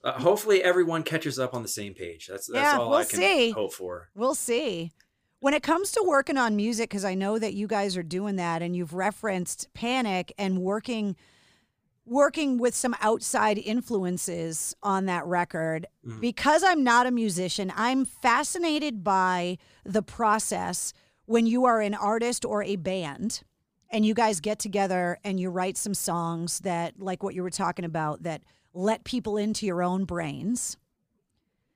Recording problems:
none

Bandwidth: 15 kHz